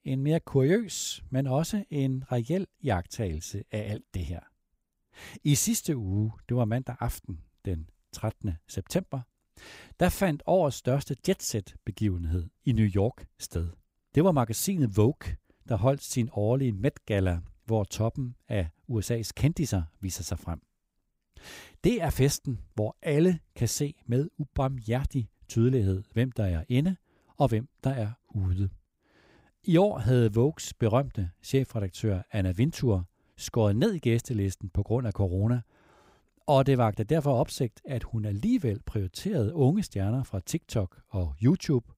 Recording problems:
none

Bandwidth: 15.5 kHz